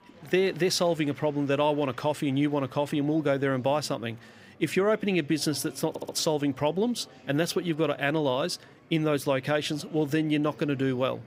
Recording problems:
murmuring crowd; faint; throughout; 25 dB below the speech
audio stuttering; at 6 s

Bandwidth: 15.5 kHz